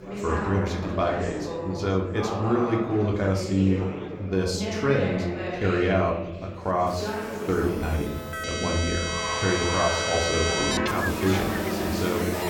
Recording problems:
room echo; slight; dies away in 0.7 s
off-mic speech; somewhat distant
background music; loud; throughout; 2 dB below the speech
chatter from many people; loud; throughout; 6 dB below the speech

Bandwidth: 18 kHz